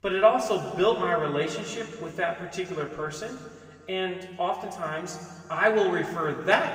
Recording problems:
room echo; noticeable; dies away in 1.9 s
off-mic speech; somewhat distant

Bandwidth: 15.5 kHz